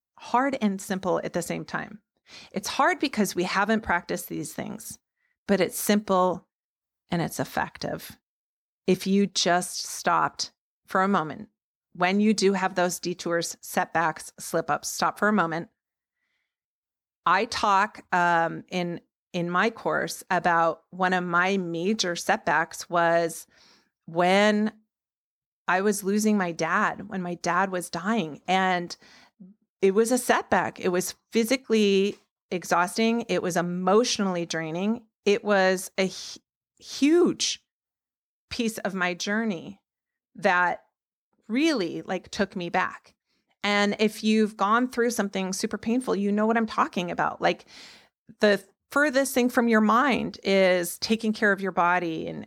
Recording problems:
none

